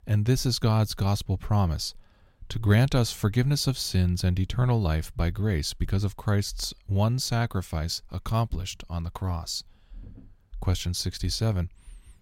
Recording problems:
none

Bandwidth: 16 kHz